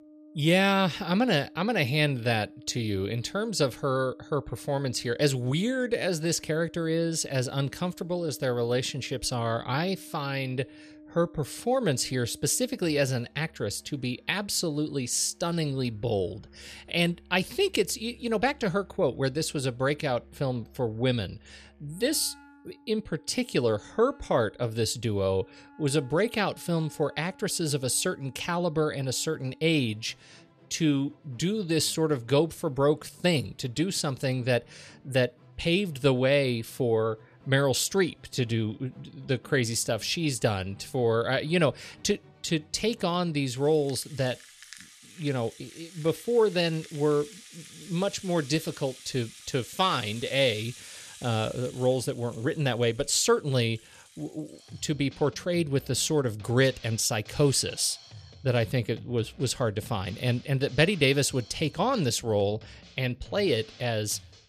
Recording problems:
background music; faint; throughout; 25 dB below the speech

